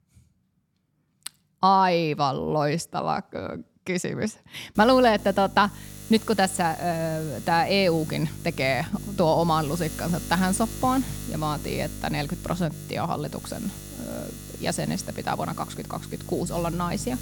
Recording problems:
electrical hum; noticeable; from 5 s on; 50 Hz, 20 dB below the speech

